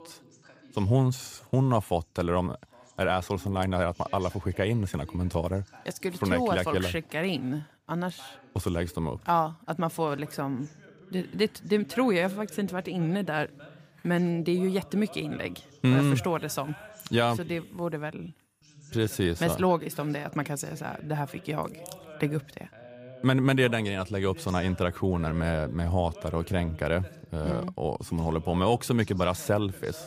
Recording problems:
voice in the background; faint; throughout; 20 dB below the speech

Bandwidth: 15 kHz